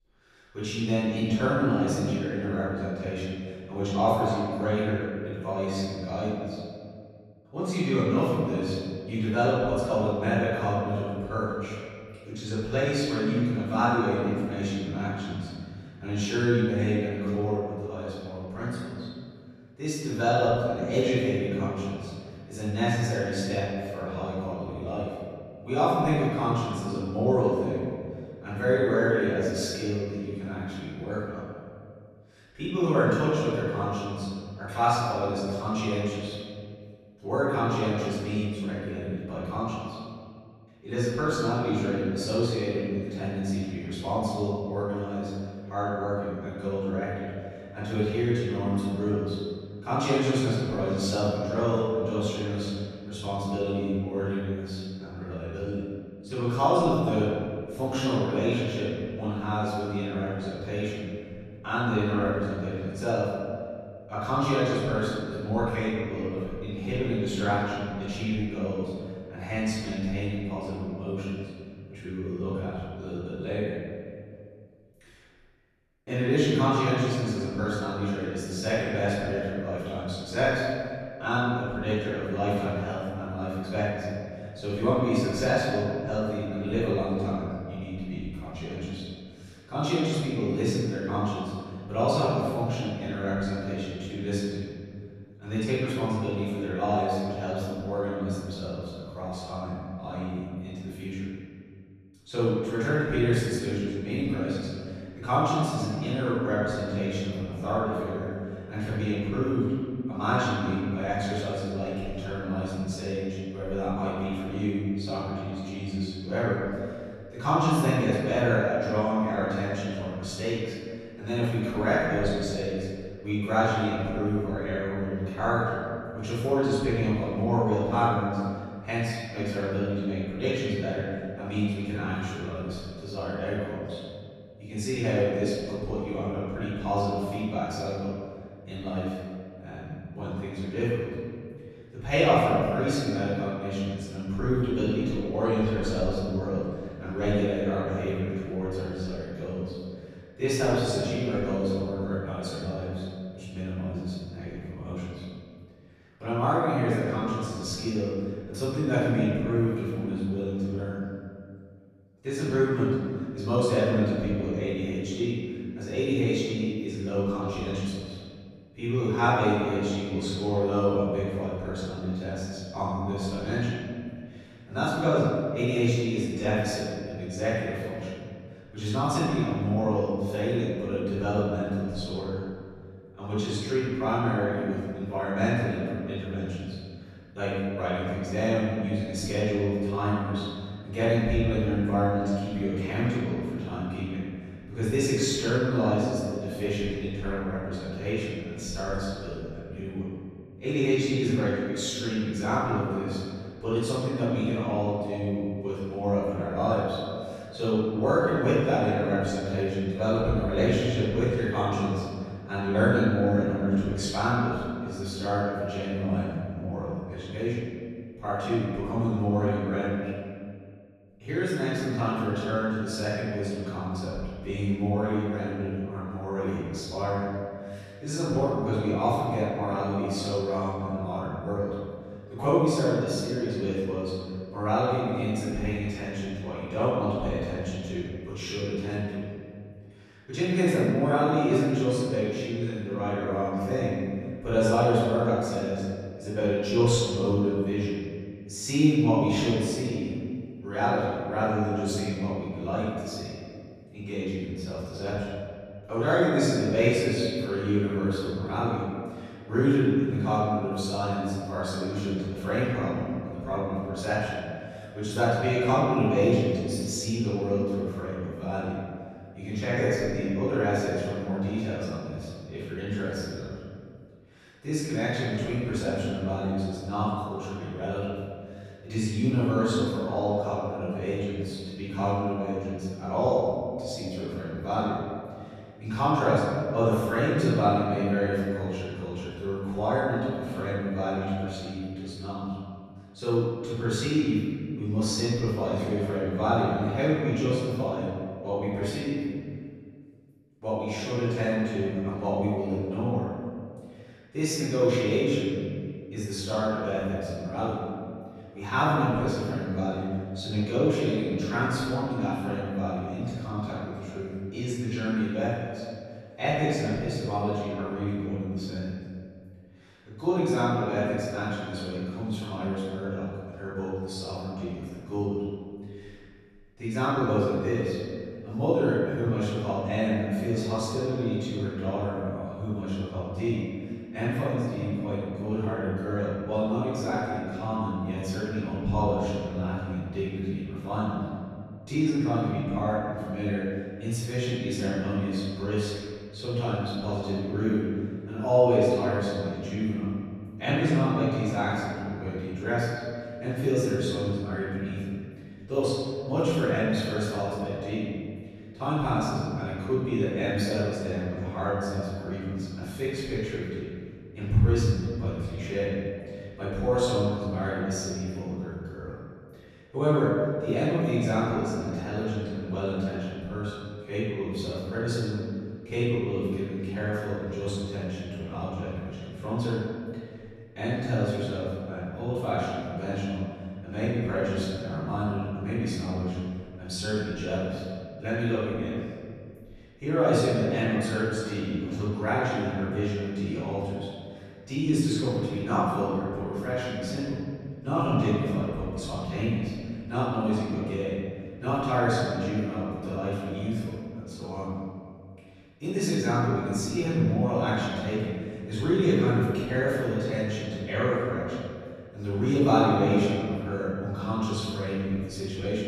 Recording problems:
room echo; strong; dies away in 2 s
off-mic speech; far

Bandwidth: 13.5 kHz